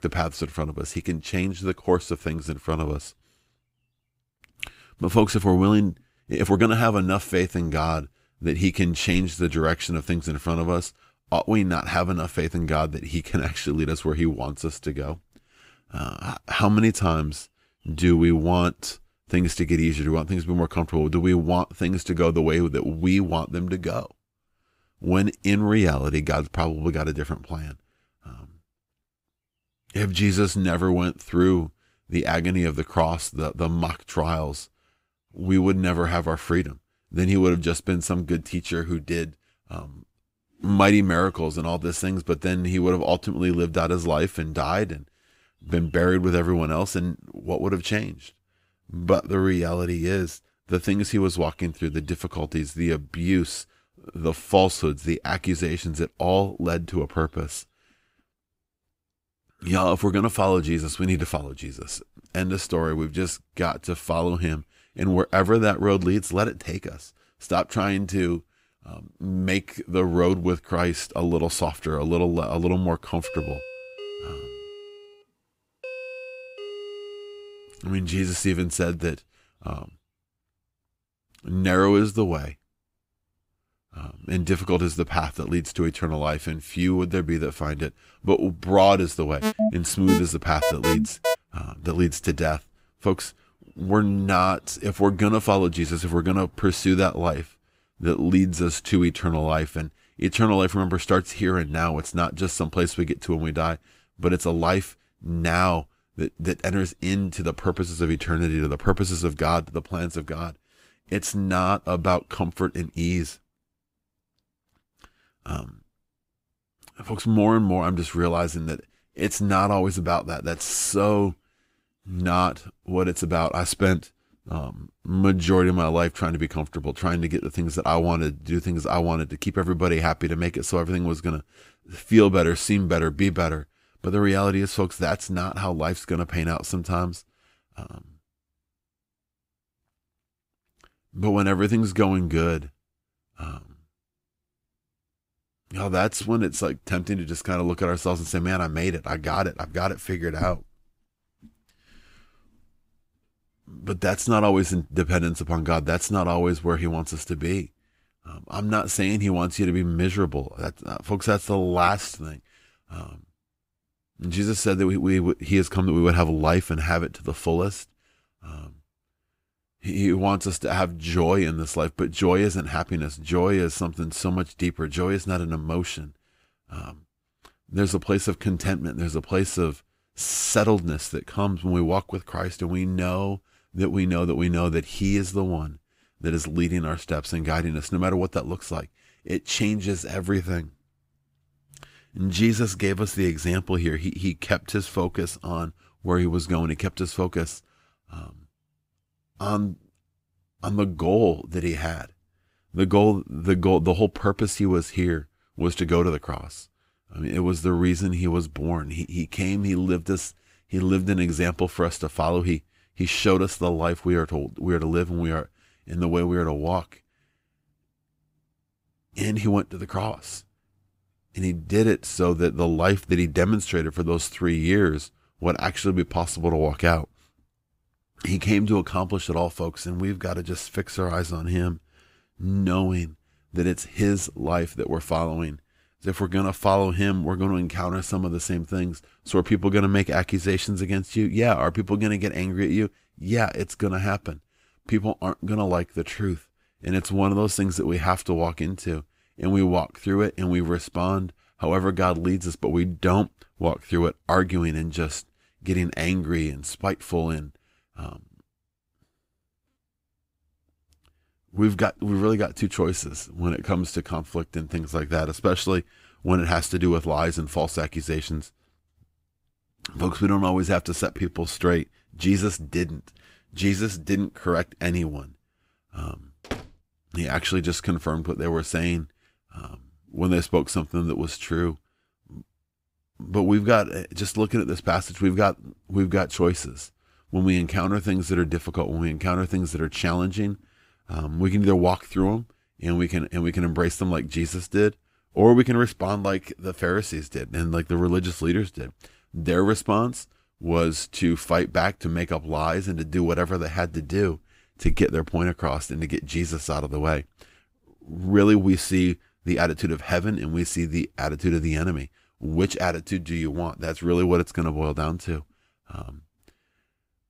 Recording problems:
uneven, jittery; strongly; from 6 s to 4:32
doorbell; faint; from 1:13 to 1:18; peak 10 dB below the speech
alarm; loud; from 1:29 to 1:31; peak 1 dB above the speech
door banging; faint; at 4:36; peak 10 dB below the speech

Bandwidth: 15.5 kHz